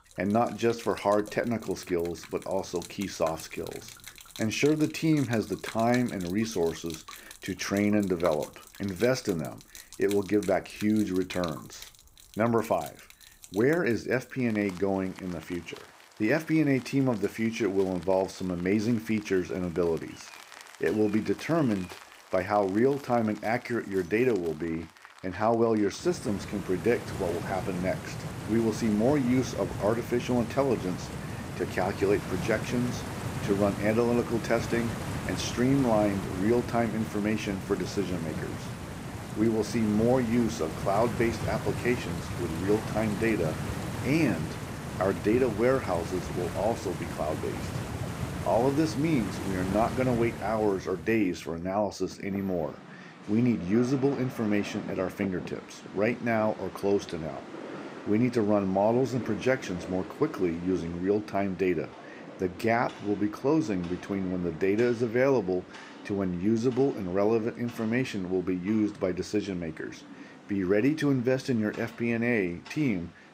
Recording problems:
rain or running water; noticeable; throughout; 10 dB below the speech

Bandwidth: 15.5 kHz